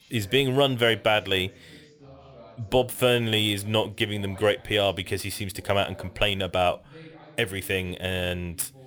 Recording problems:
background chatter; faint; throughout; 2 voices, 25 dB below the speech

